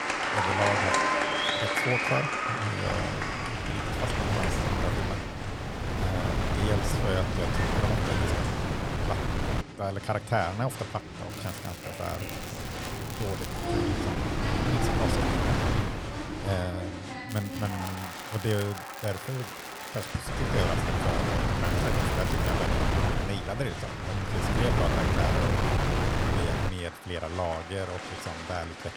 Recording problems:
wind noise on the microphone; heavy; from 3 to 9.5 s, from 12 to 17 s and from 20 to 27 s; 3 dB above the speech
crowd noise; loud; throughout; as loud as the speech
crackling; loud; from 11 to 14 s, from 17 to 20 s and at 22 s; 10 dB below the speech

